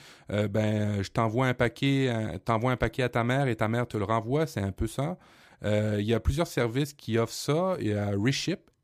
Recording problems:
none

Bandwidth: 15 kHz